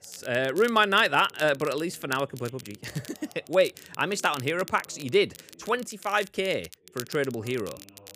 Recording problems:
crackle, like an old record; noticeable; 20 dB below the speech
voice in the background; faint; throughout; 30 dB below the speech

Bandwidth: 15 kHz